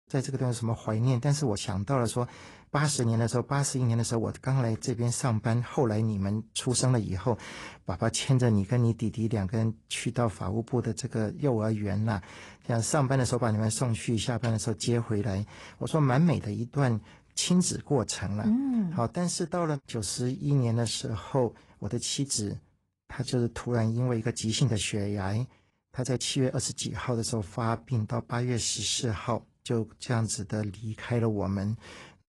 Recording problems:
garbled, watery; slightly; nothing above 10.5 kHz
uneven, jittery; strongly; from 1.5 to 31 s

